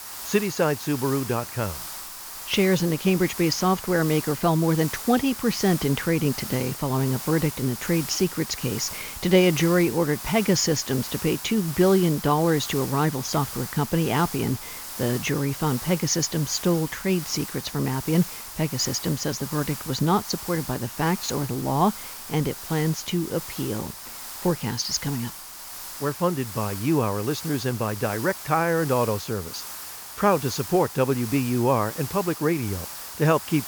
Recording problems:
high frequencies cut off; noticeable; nothing above 7 kHz
hiss; loud; throughout; 10 dB below the speech

